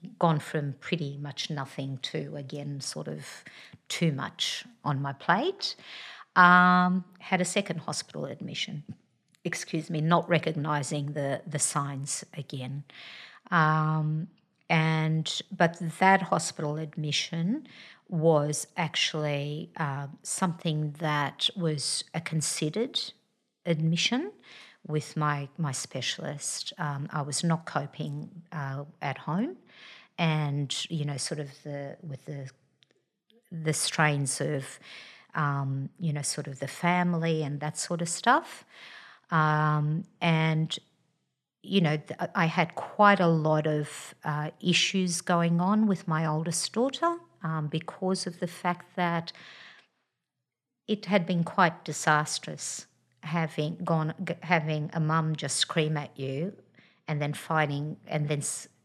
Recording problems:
none

